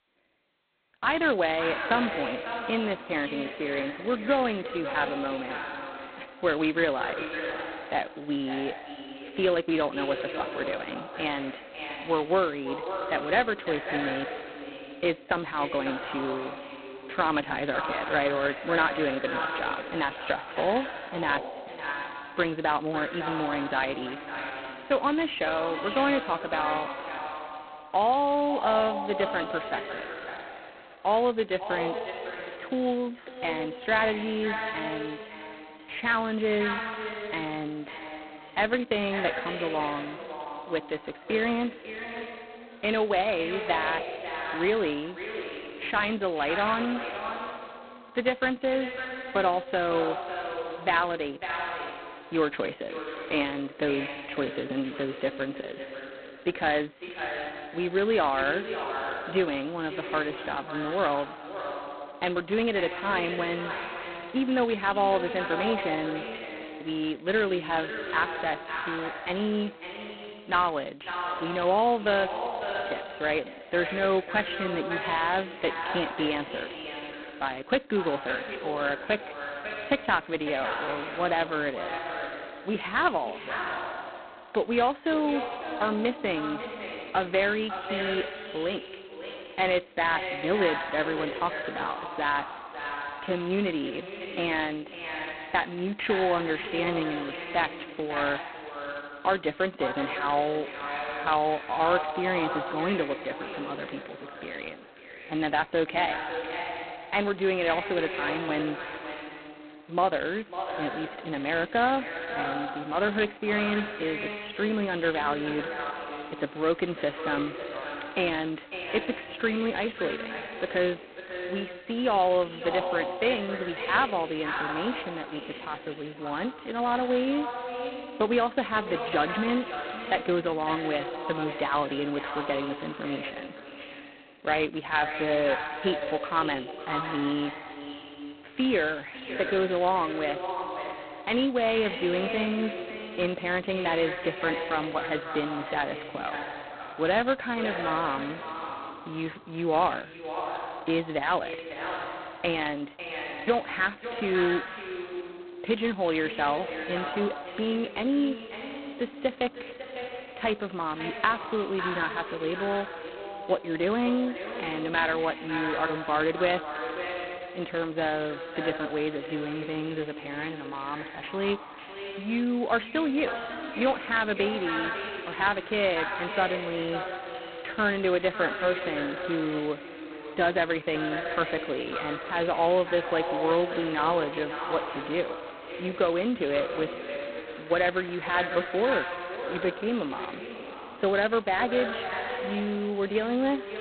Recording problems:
phone-call audio; poor line; nothing above 4 kHz
echo of what is said; strong; throughout; 550 ms later, 7 dB below the speech
traffic noise; faint; throughout; 25 dB below the speech

